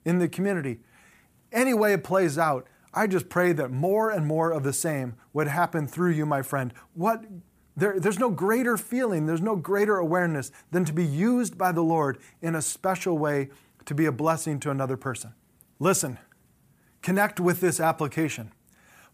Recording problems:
none

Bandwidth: 15 kHz